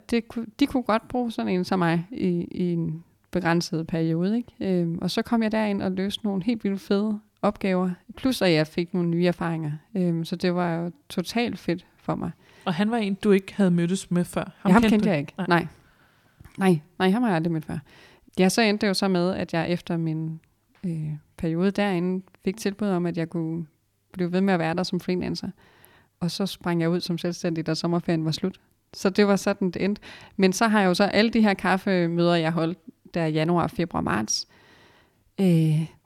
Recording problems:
none

